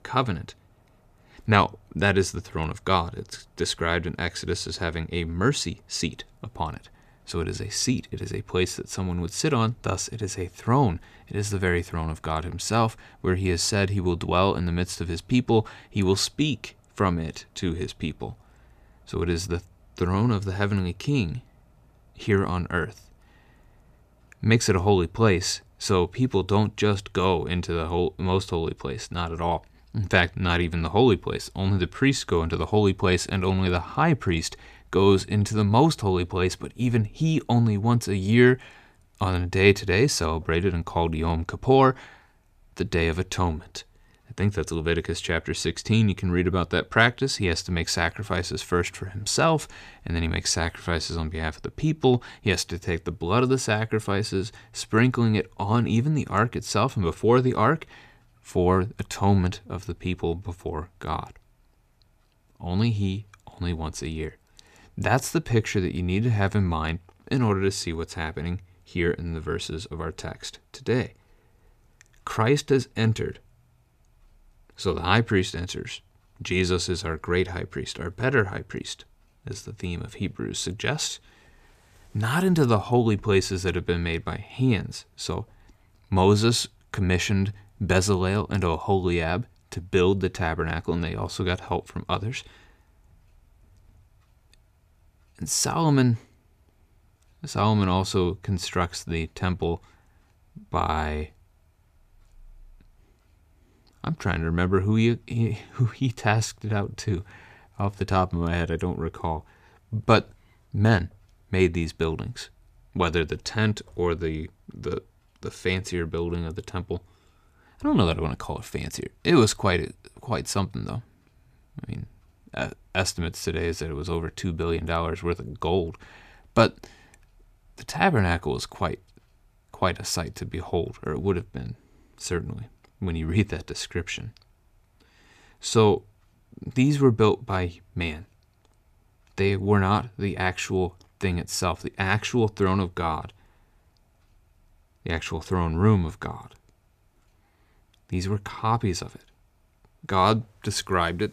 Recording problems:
none

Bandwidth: 14.5 kHz